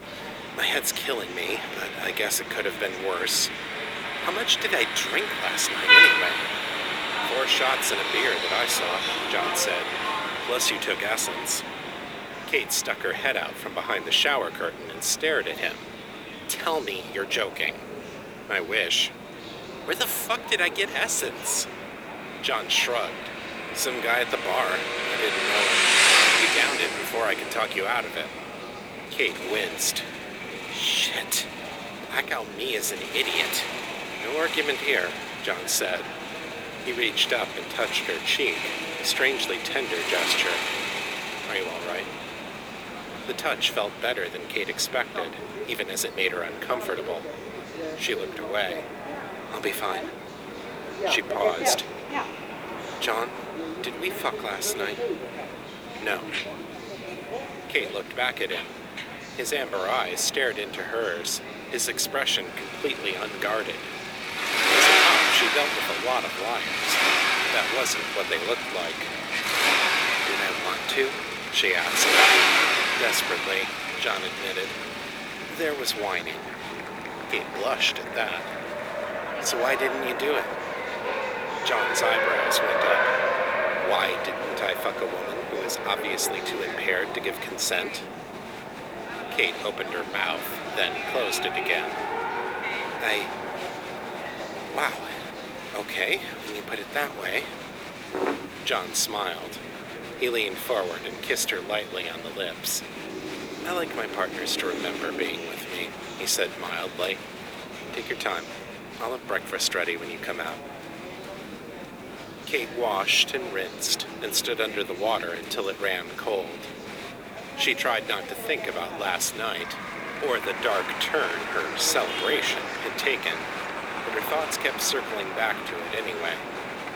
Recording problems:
thin; very; fading below 350 Hz
traffic noise; very loud; throughout; 1 dB above the speech
murmuring crowd; noticeable; throughout; 10 dB below the speech
wind noise on the microphone; occasional gusts; from 11 s to 1:44; 20 dB below the speech
hiss; noticeable; throughout; 15 dB below the speech

